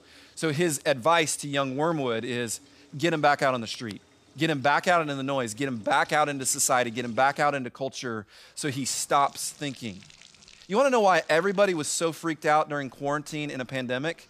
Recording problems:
household noises; faint; throughout; 30 dB below the speech

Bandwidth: 15 kHz